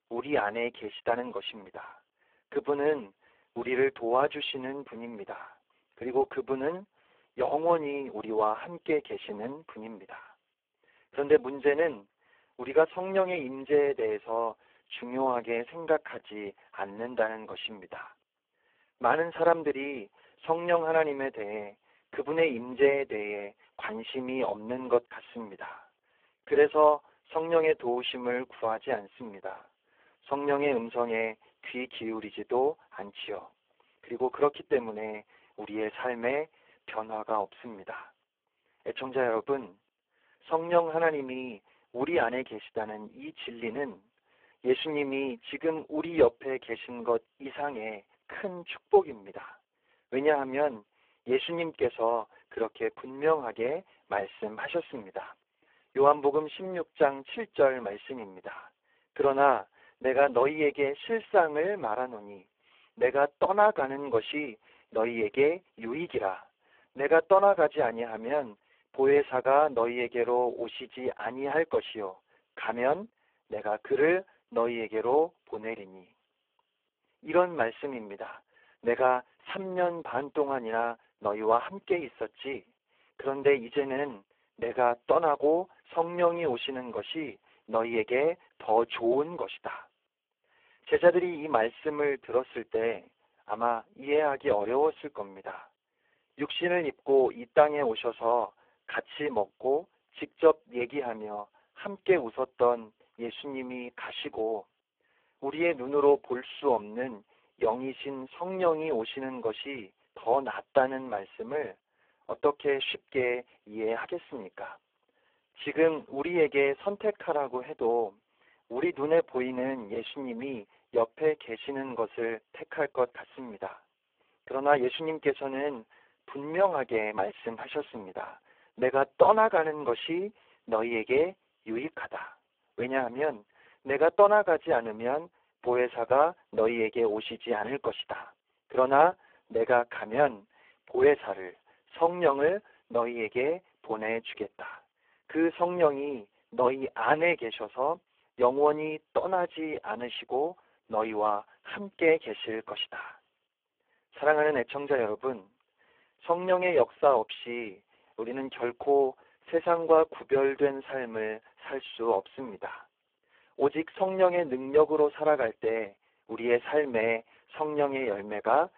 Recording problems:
phone-call audio; poor line

